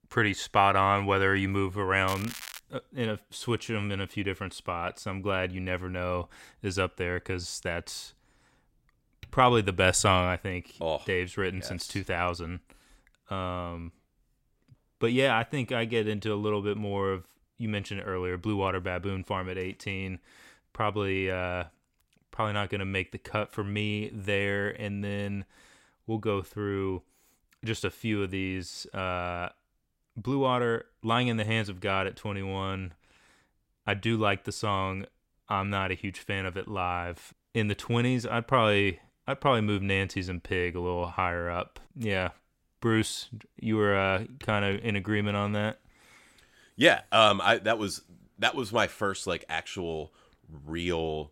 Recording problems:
crackling; noticeable; at 2 s; 10 dB below the speech

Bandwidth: 16 kHz